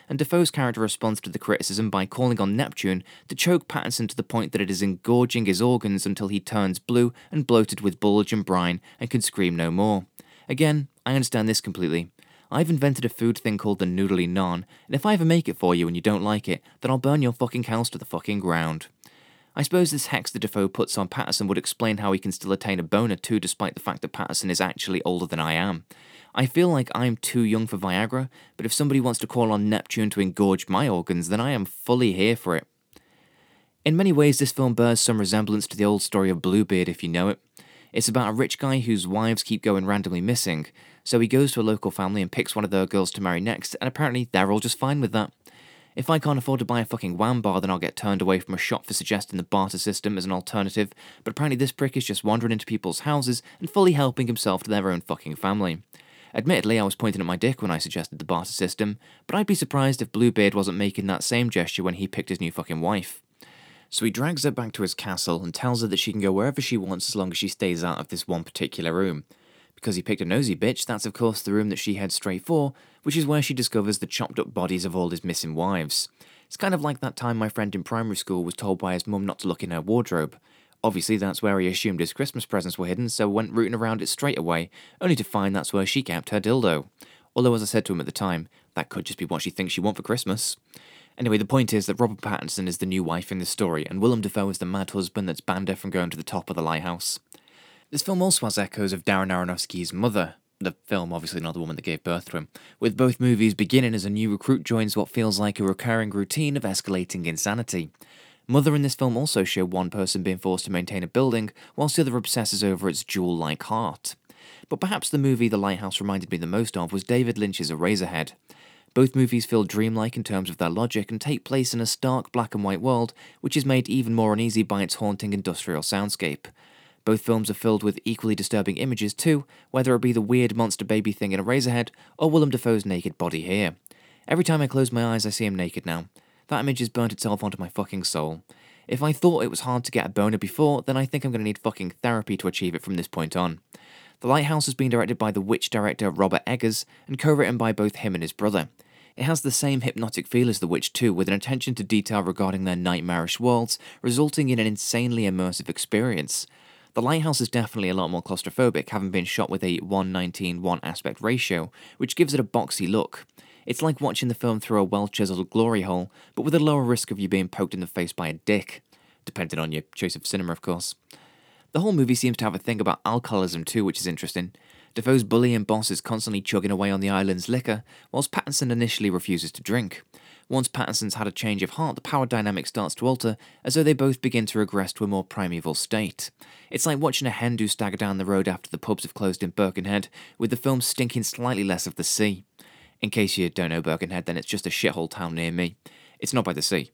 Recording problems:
none

